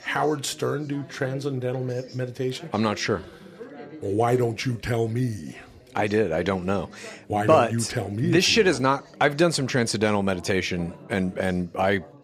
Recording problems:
background chatter; faint; throughout; 4 voices, 20 dB below the speech

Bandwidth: 14.5 kHz